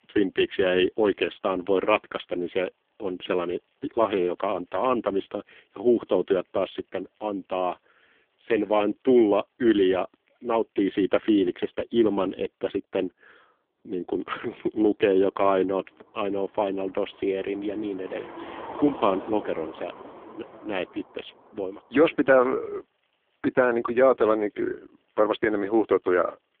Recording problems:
phone-call audio; poor line
traffic noise; noticeable; throughout; 15 dB below the speech

